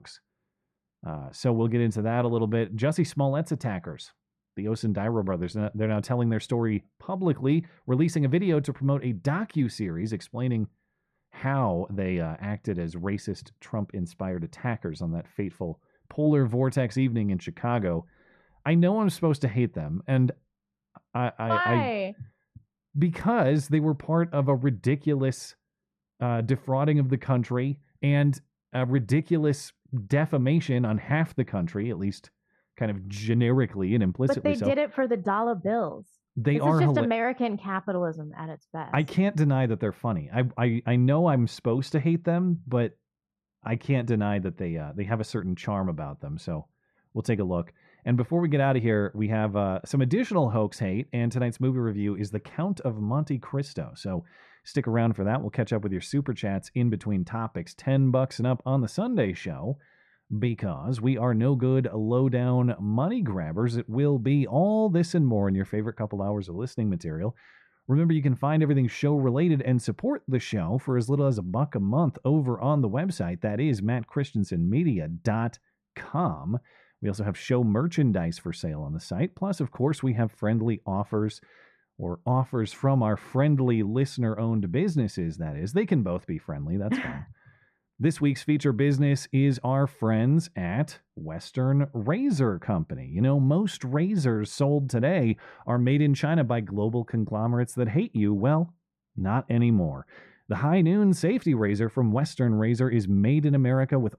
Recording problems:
muffled; very; fading above 2.5 kHz

